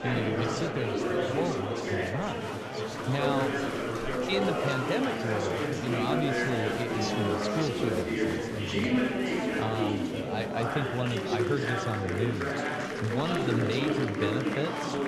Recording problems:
murmuring crowd; very loud; throughout; 3 dB above the speech

